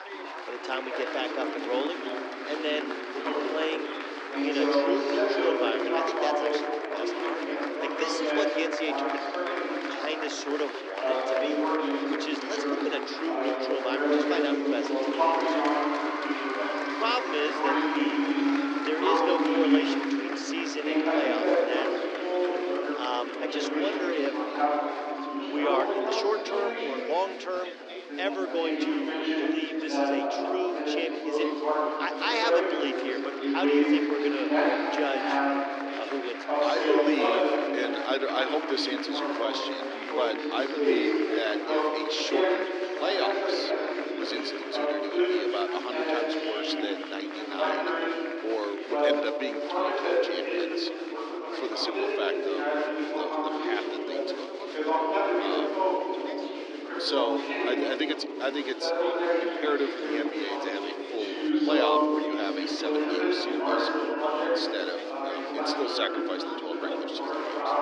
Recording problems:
thin; somewhat; fading below 300 Hz
muffled; very slightly; fading above 3.5 kHz
chatter from many people; very loud; throughout; 4 dB above the speech

